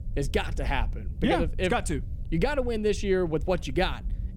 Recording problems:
low rumble; faint; throughout; 25 dB below the speech

